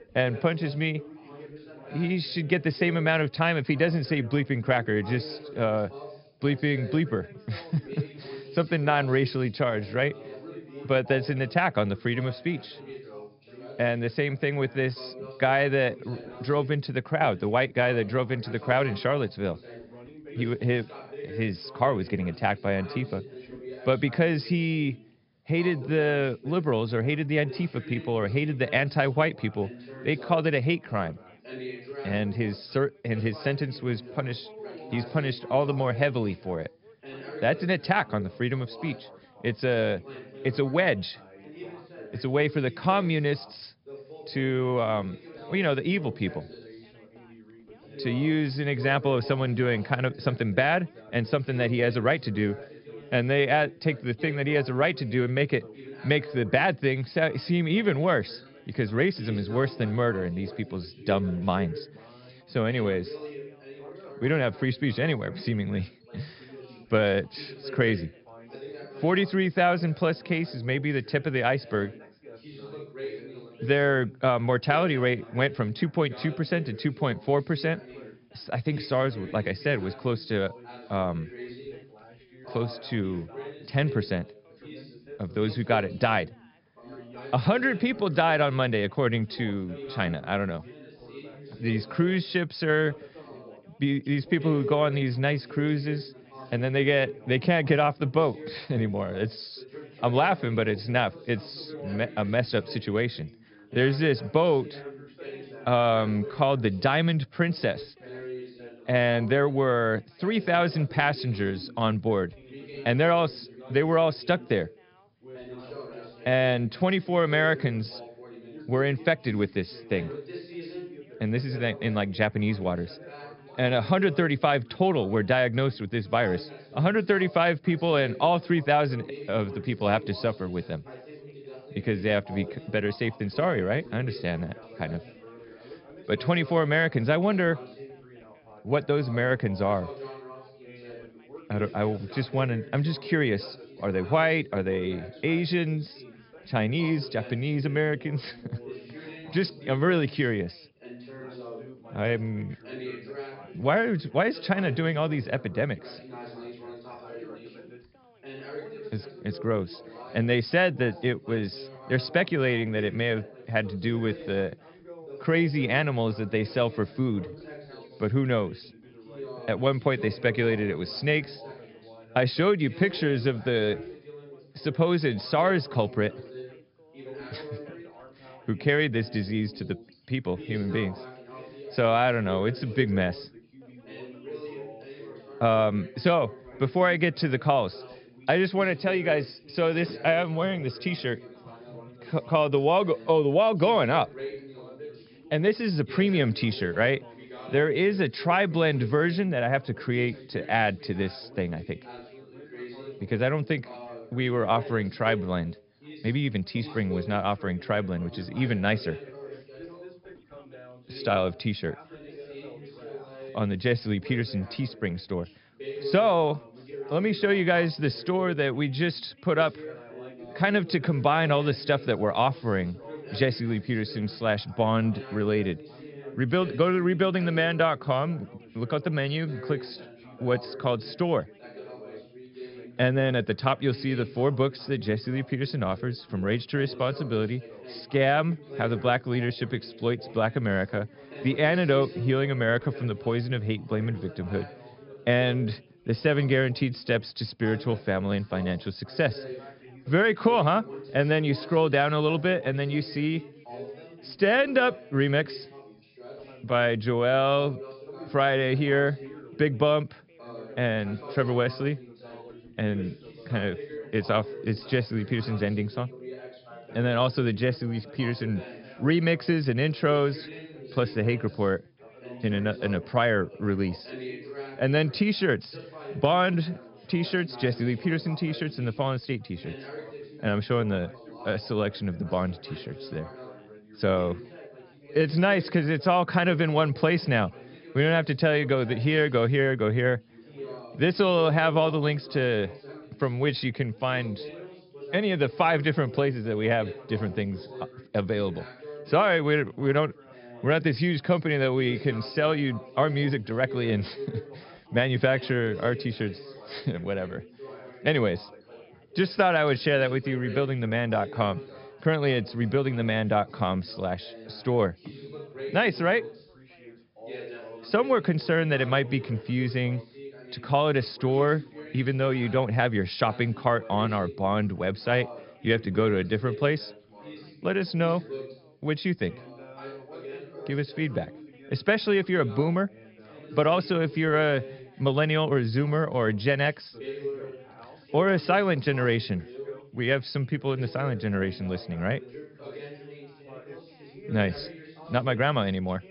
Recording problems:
high frequencies cut off; noticeable; nothing above 5.5 kHz
background chatter; noticeable; throughout; 3 voices, 15 dB below the speech

